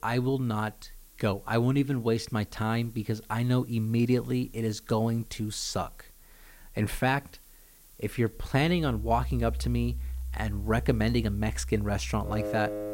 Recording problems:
background music; loud; from 9 s on; 7 dB below the speech
hiss; faint; throughout; 25 dB below the speech

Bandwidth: 16 kHz